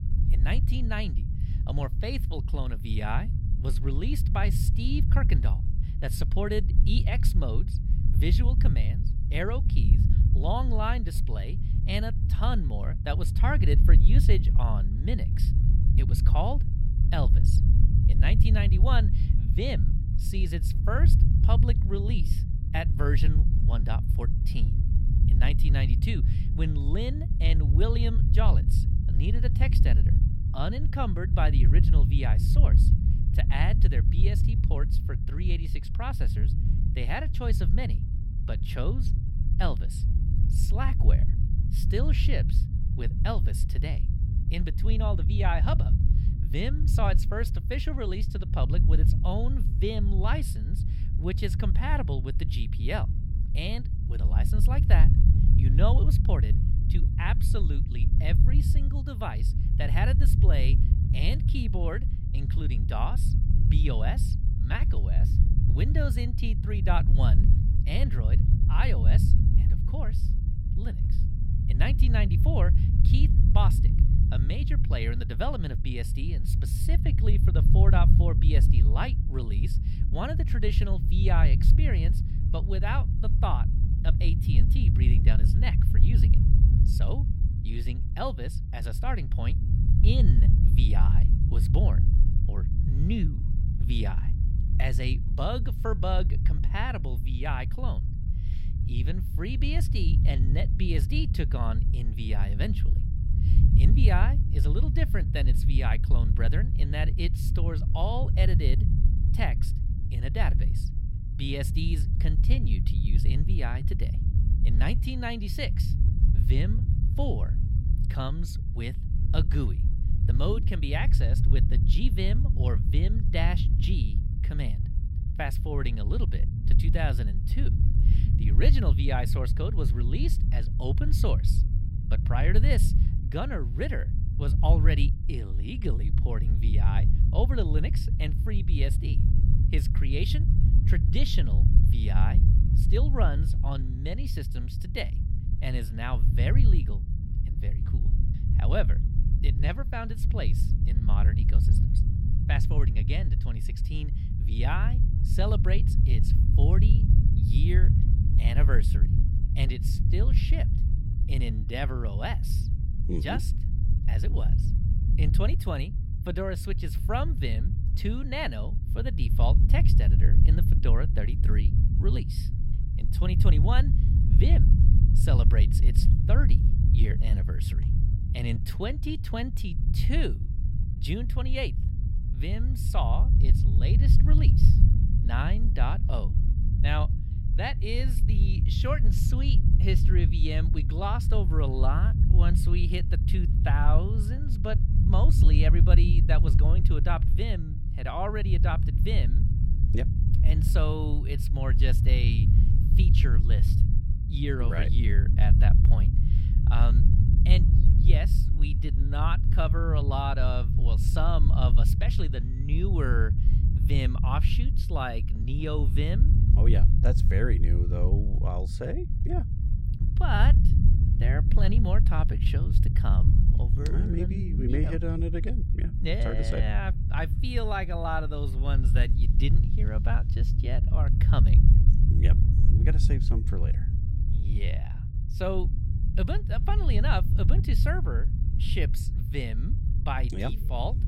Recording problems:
low rumble; loud; throughout; 5 dB below the speech

